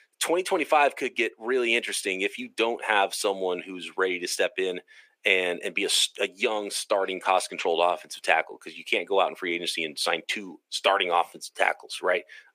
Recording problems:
thin; very; fading below 400 Hz

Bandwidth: 15 kHz